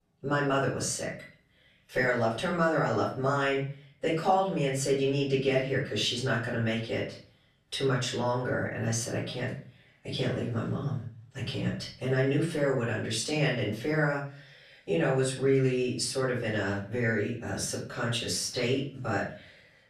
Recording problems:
off-mic speech; far
room echo; slight; dies away in 0.4 s

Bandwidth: 14 kHz